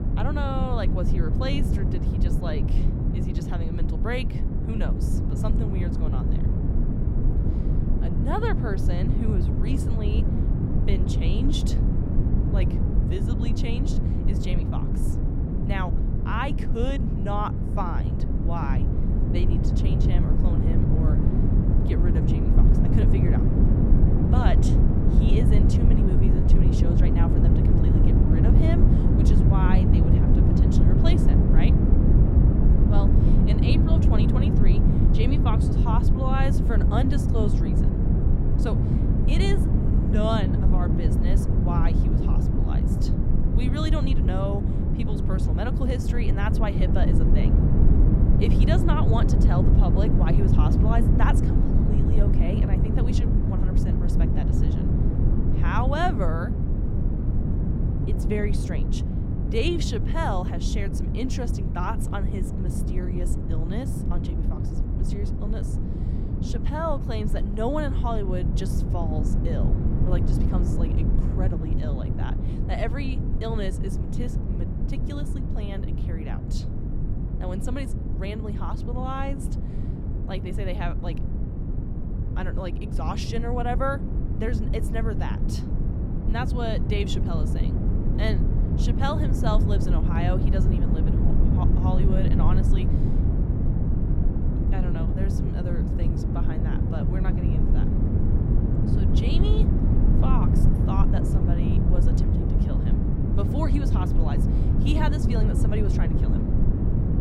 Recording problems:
low rumble; loud; throughout; 1 dB below the speech

